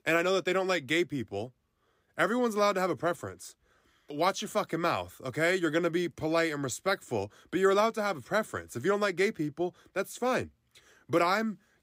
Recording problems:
none

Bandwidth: 15.5 kHz